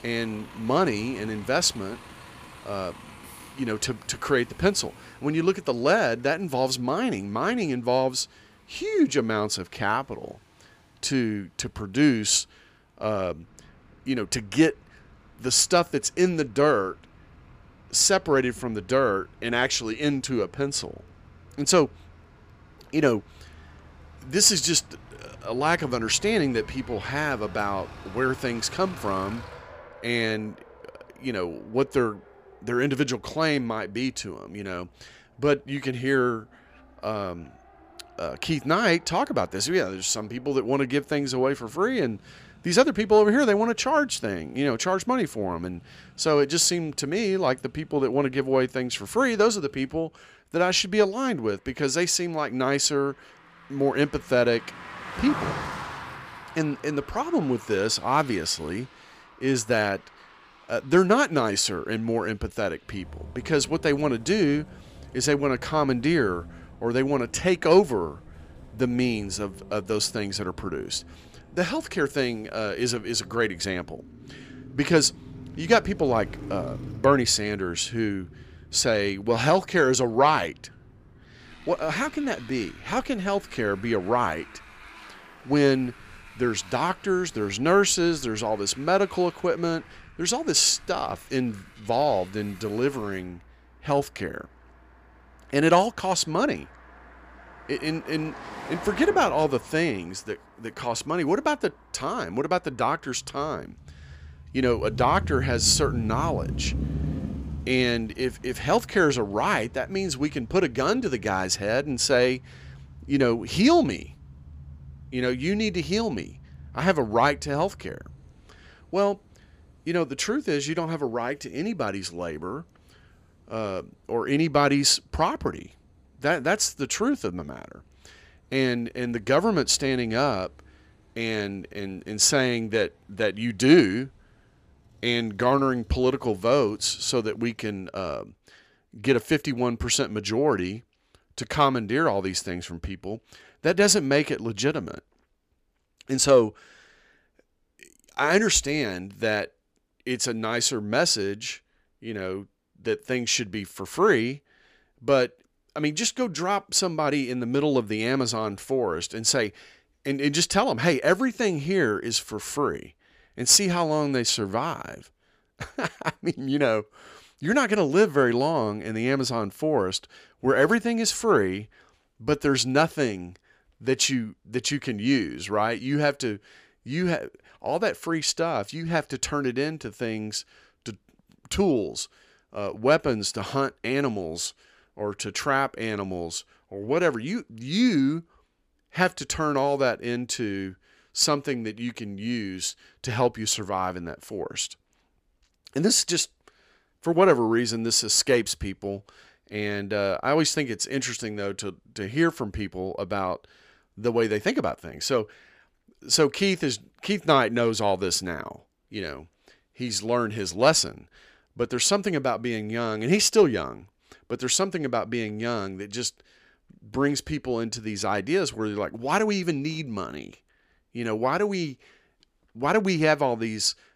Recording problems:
traffic noise; noticeable; until 2:17; 20 dB below the speech

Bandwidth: 15 kHz